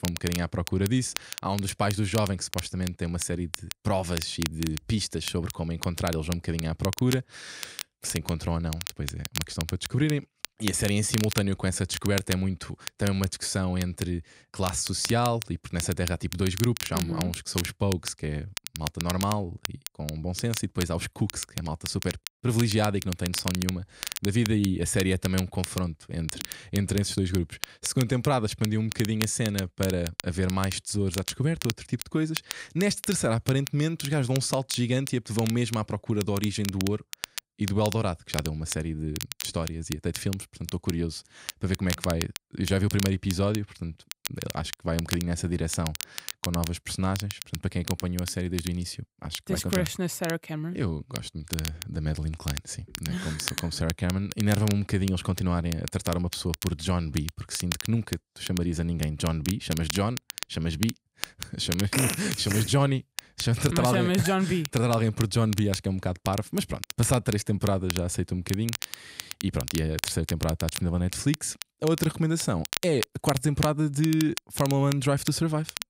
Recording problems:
crackle, like an old record; loud; 9 dB below the speech

